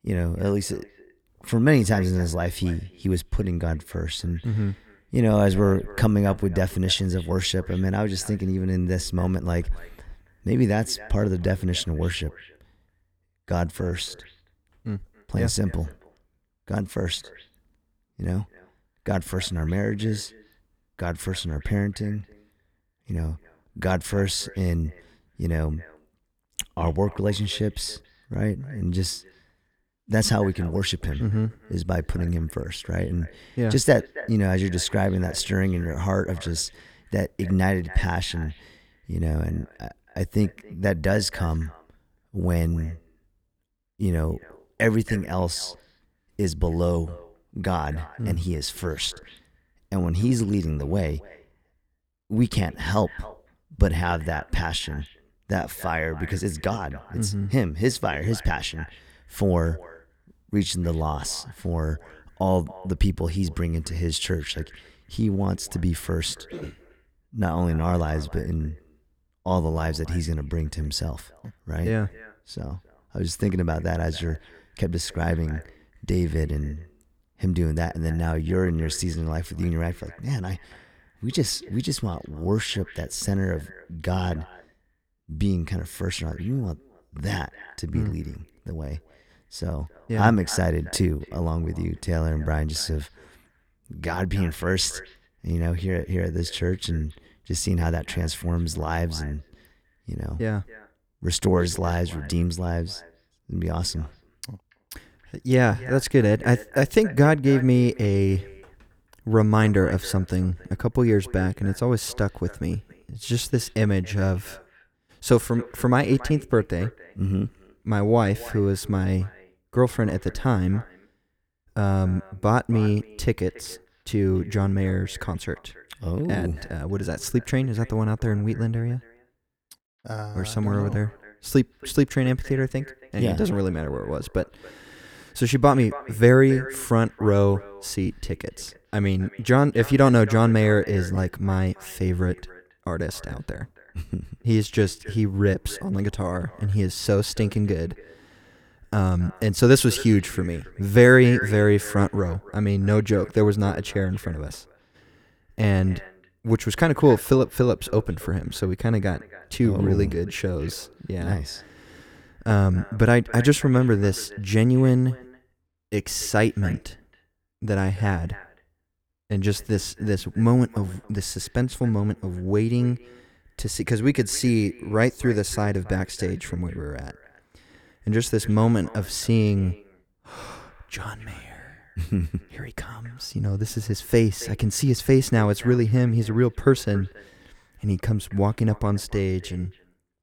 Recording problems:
echo of what is said; faint; throughout; 280 ms later, 20 dB below the speech

